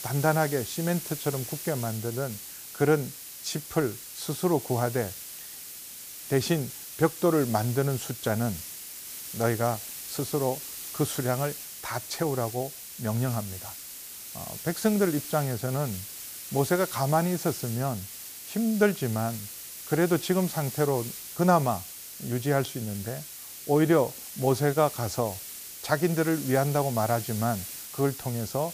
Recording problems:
hiss; loud; throughout; 9 dB below the speech

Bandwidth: 15 kHz